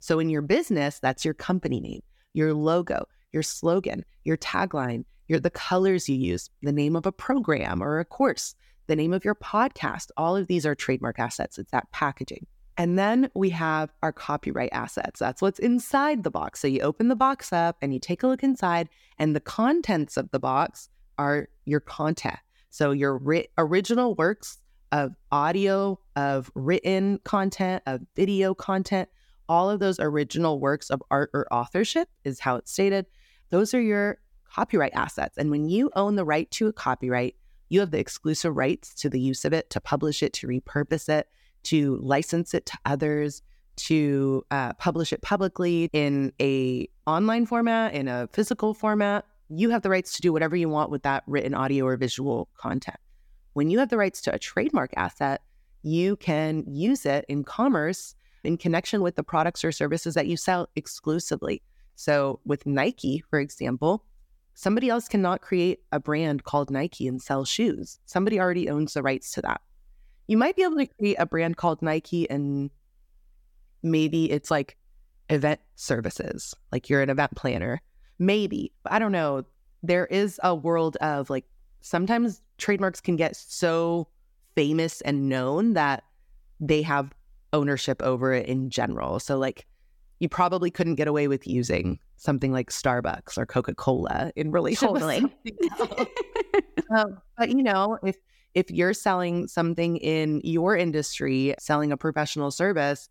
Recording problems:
none

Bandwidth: 17.5 kHz